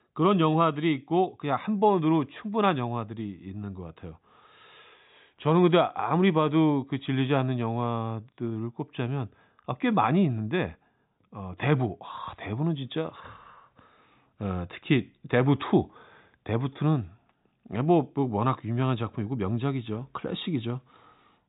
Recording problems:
high frequencies cut off; severe; nothing above 4 kHz

